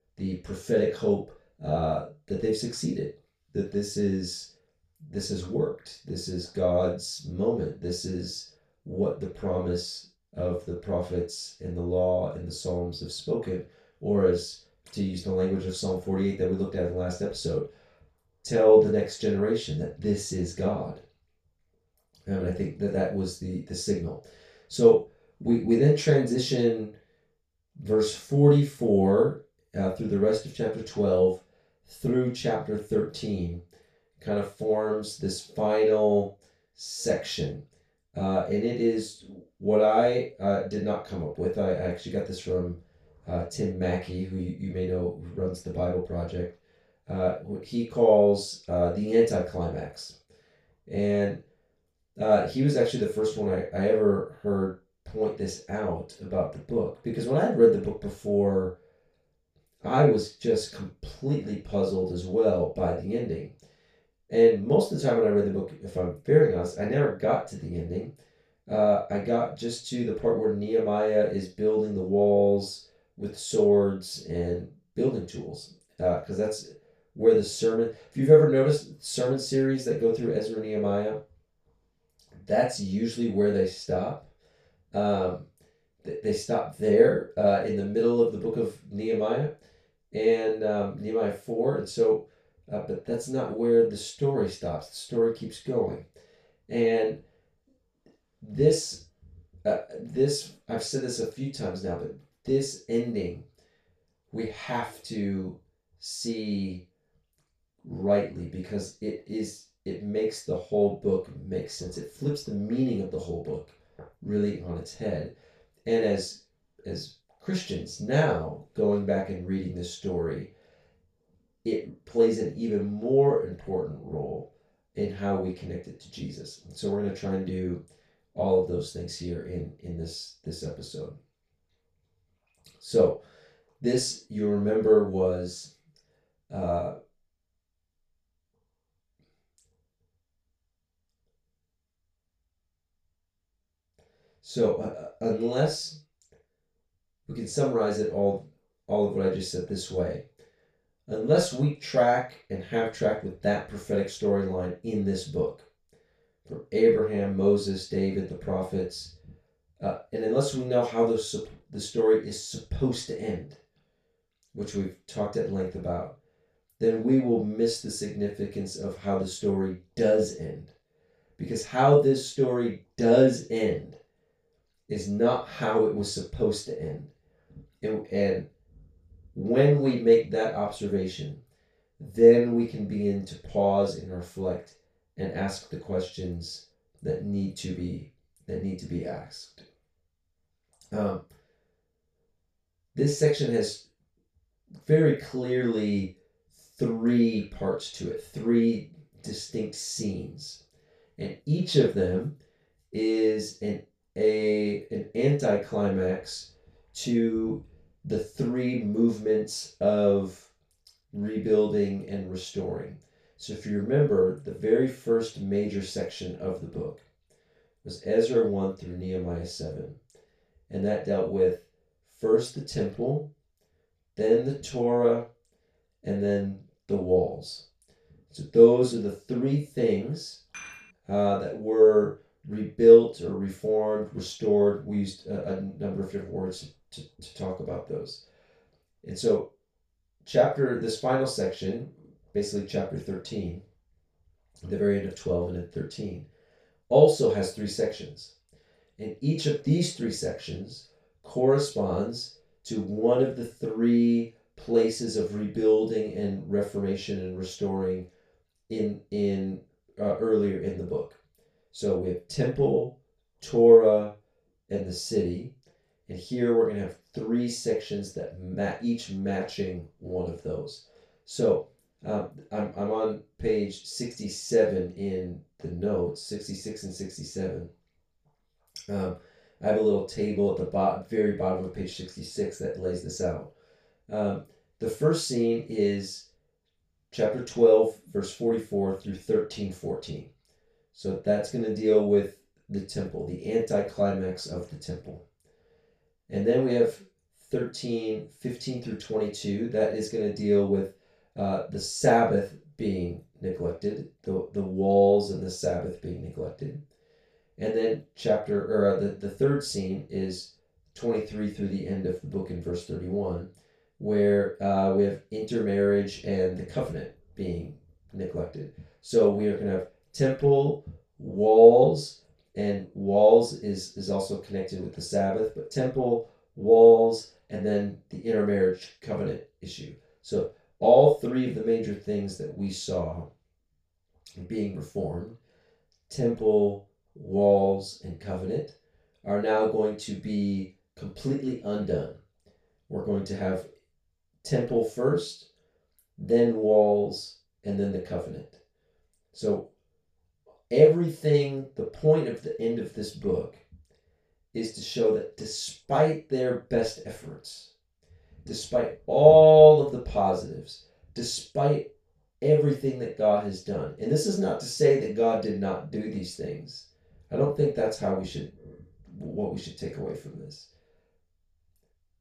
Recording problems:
off-mic speech; far
room echo; noticeable; dies away in 0.3 s
clattering dishes; faint; at 3:51; peak 15 dB below the speech

